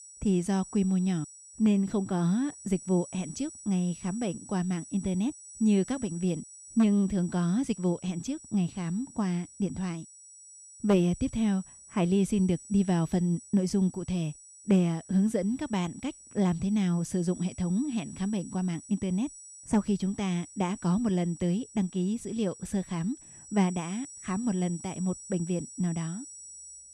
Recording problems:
high-pitched whine; noticeable; throughout; 8 kHz, 15 dB below the speech

